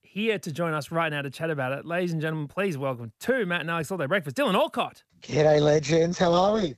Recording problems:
none

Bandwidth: 14.5 kHz